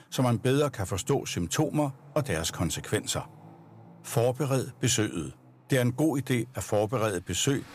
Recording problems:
traffic noise; faint; throughout; 25 dB below the speech

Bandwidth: 15 kHz